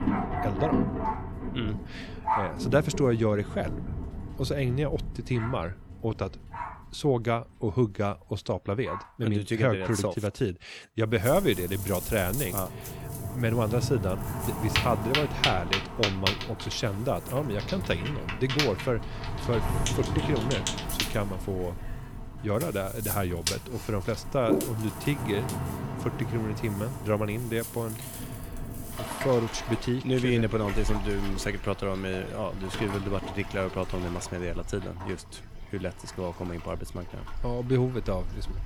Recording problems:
rain or running water; loud; throughout; 4 dB below the speech

